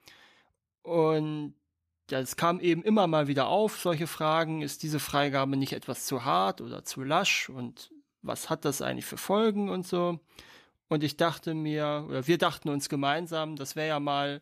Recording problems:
none

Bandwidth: 14.5 kHz